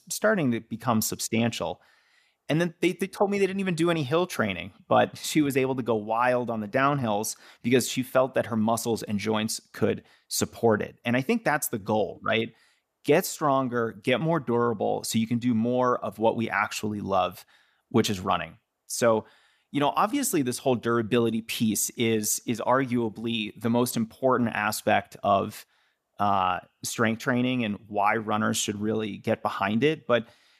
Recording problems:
none

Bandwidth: 14.5 kHz